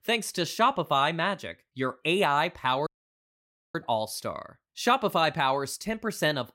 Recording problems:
audio cutting out; at 3 s for 1 s

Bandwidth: 16 kHz